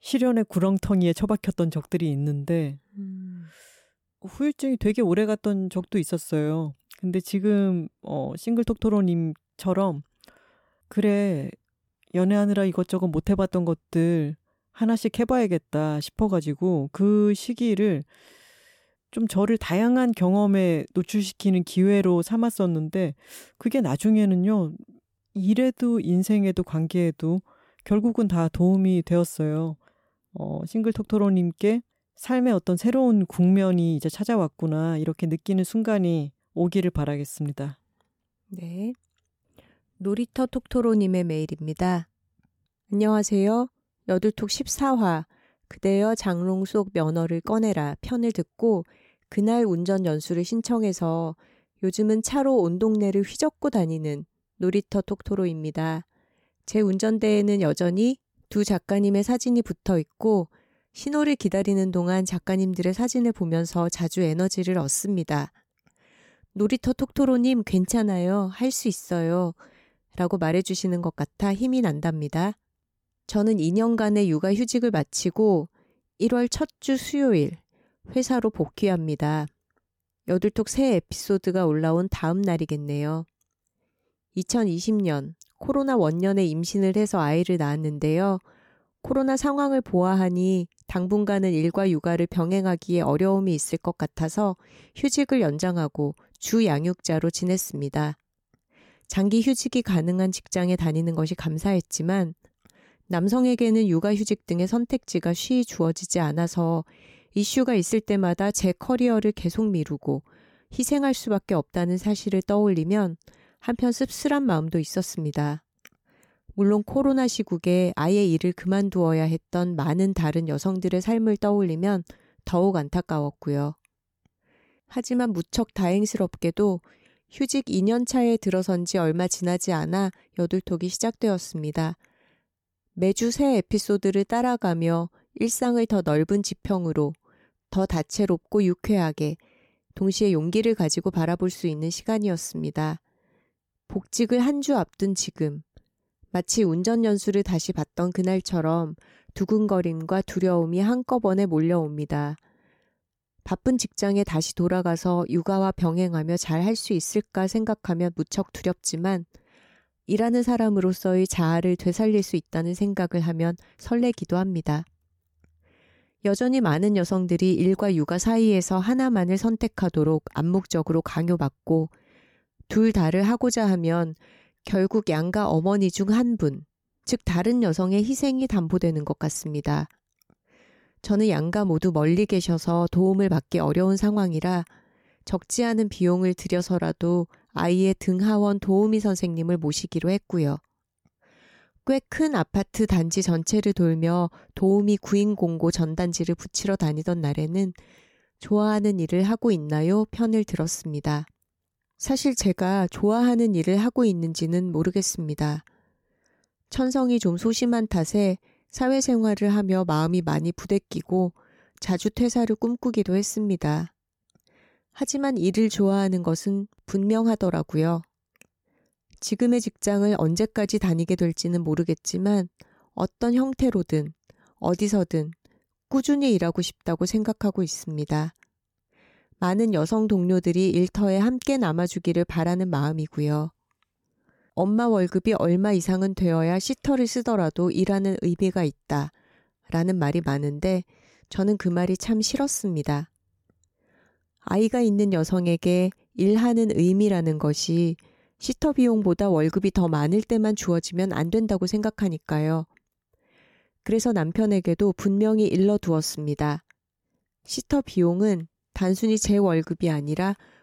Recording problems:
none

